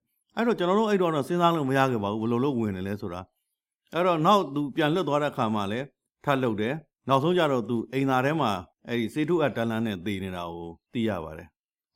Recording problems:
none

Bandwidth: 16.5 kHz